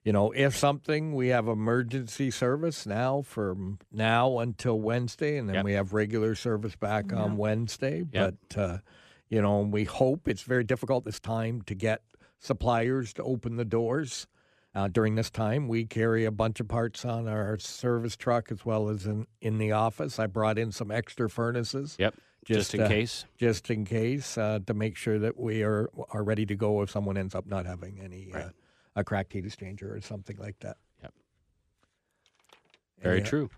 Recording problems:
uneven, jittery; strongly; from 1 to 30 s

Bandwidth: 14.5 kHz